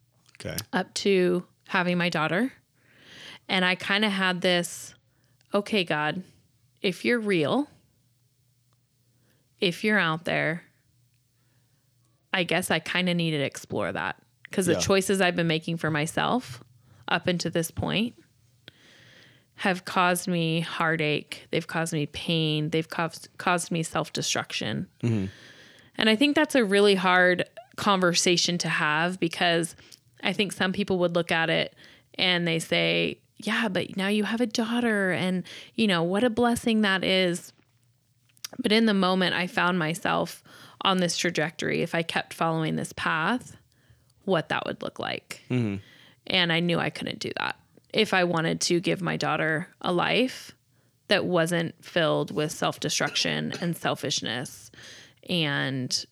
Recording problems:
none

